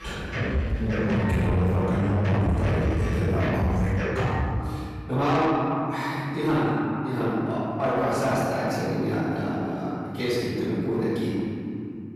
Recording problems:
room echo; strong; dies away in 2.6 s
off-mic speech; far
distortion; slight; 10 dB below the speech
background music; loud; until 4.5 s; 3 dB below the speech

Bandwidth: 15 kHz